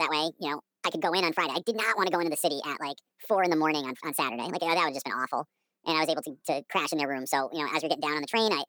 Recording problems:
wrong speed and pitch; too fast and too high; 1.6 times normal speed
abrupt cut into speech; at the start

